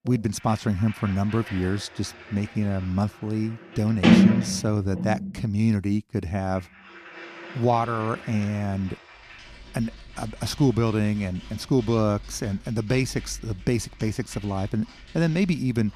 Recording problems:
household noises; very loud; throughout; 1 dB above the speech

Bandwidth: 14.5 kHz